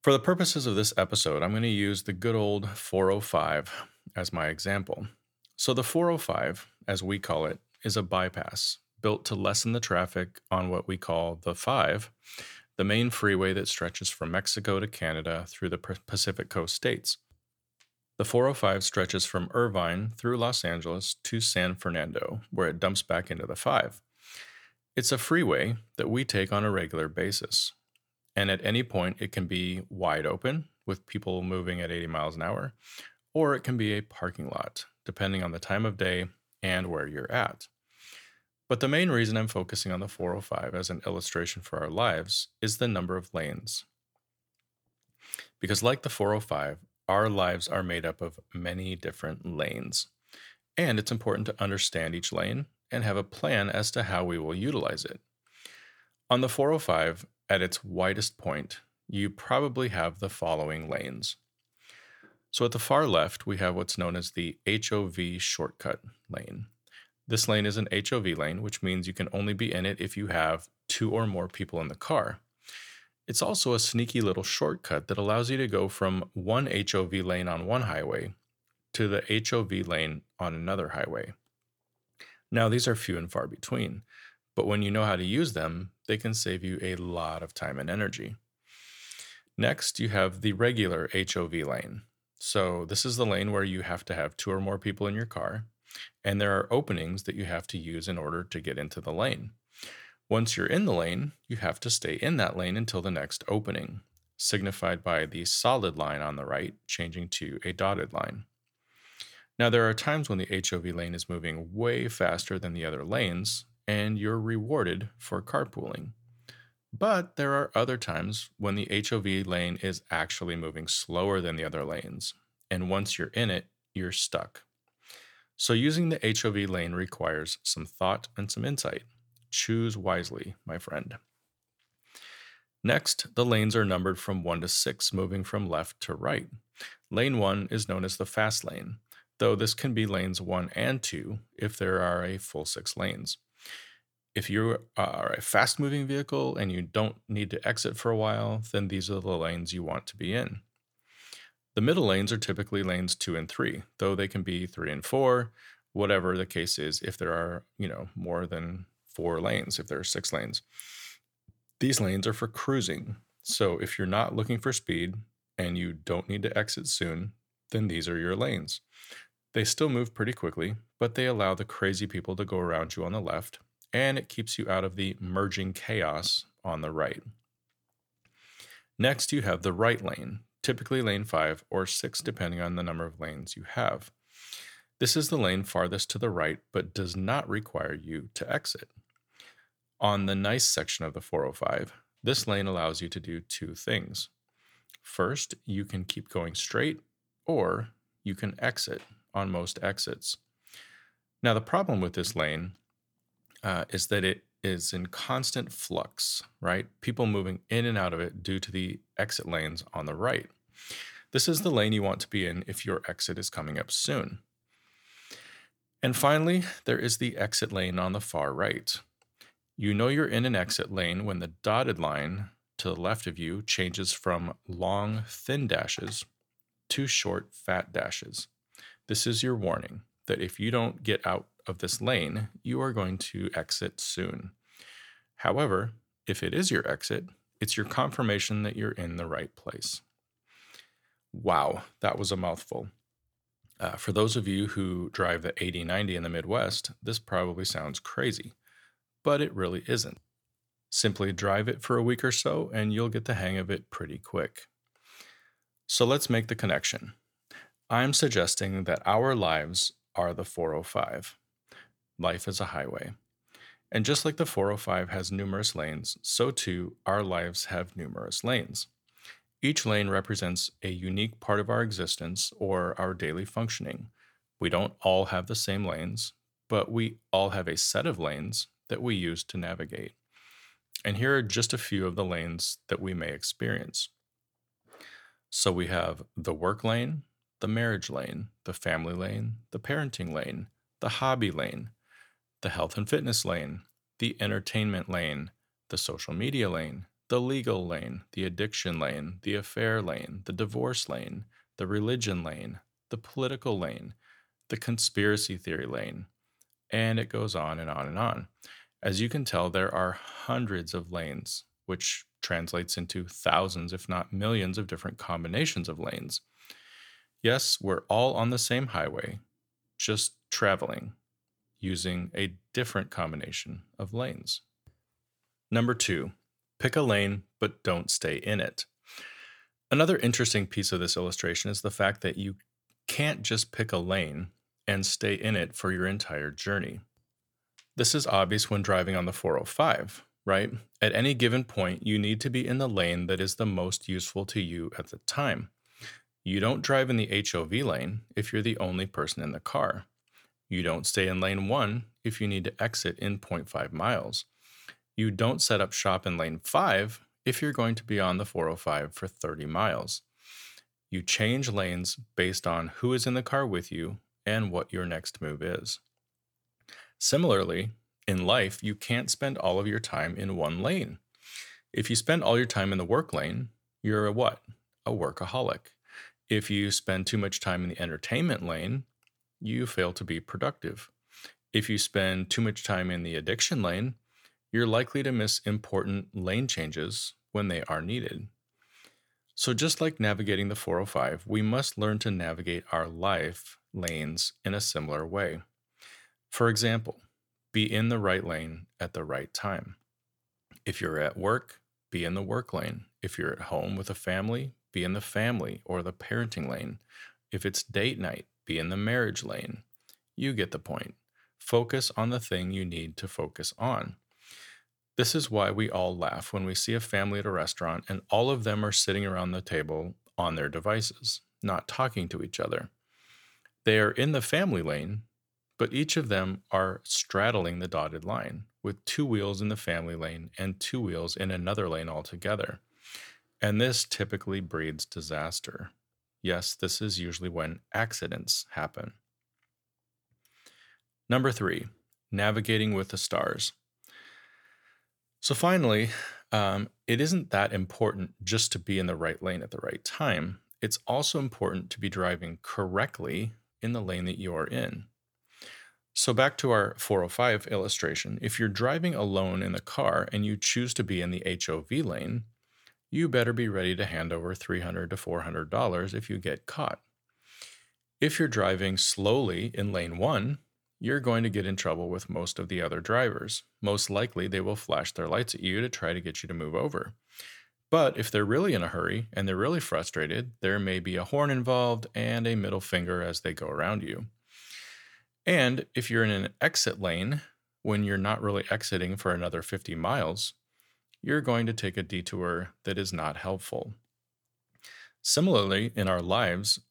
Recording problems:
none

